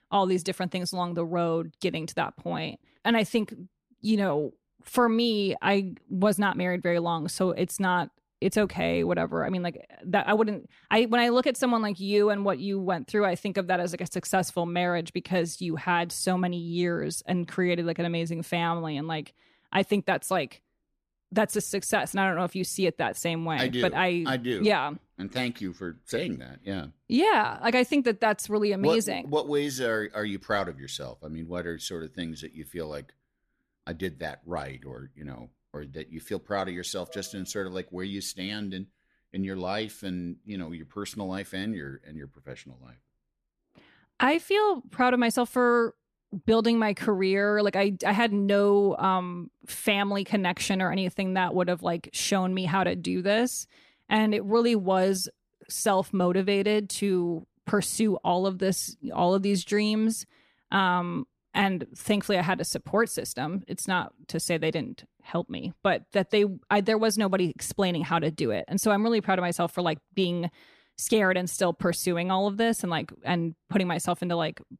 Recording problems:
none

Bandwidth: 14.5 kHz